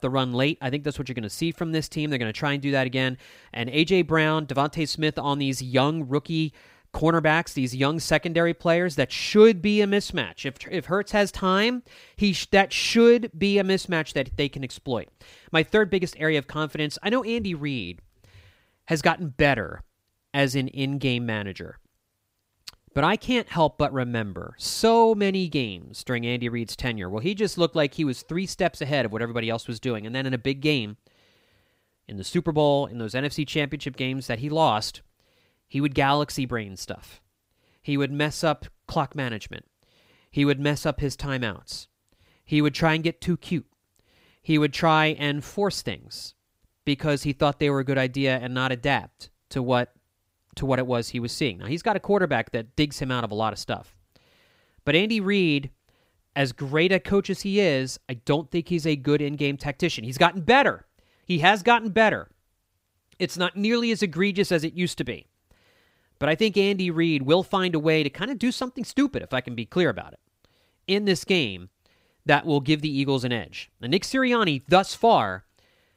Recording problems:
none

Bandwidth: 15.5 kHz